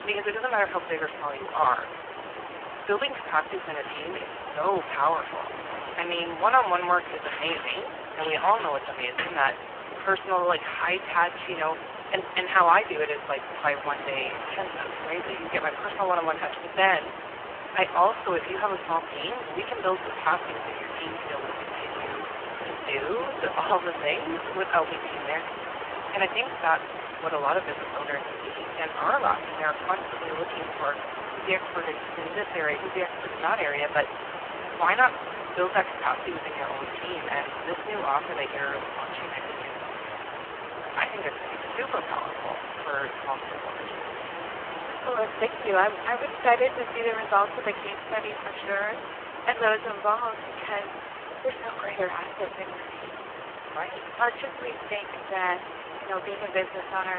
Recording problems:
phone-call audio; poor line
thin; very; fading below 450 Hz
hiss; loud; throughout; 7 dB below the speech
traffic noise; noticeable; until 21 s; 10 dB below the speech
abrupt cut into speech; at the end

